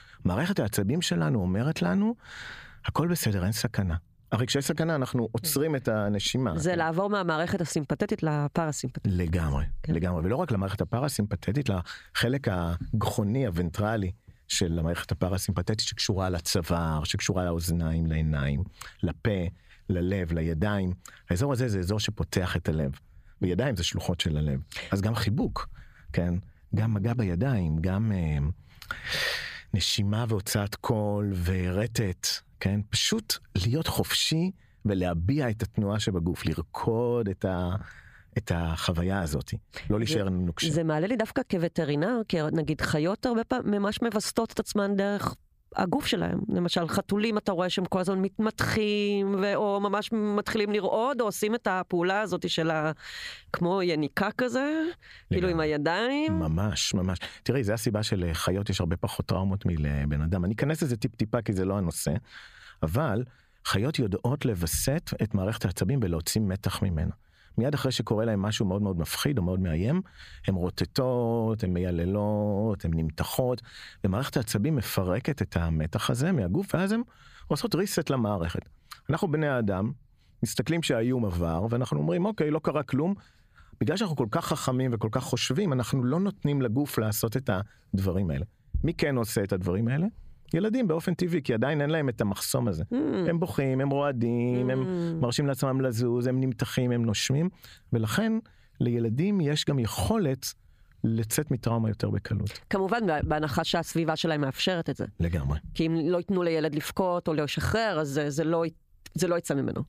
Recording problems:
squashed, flat; heavily

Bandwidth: 15 kHz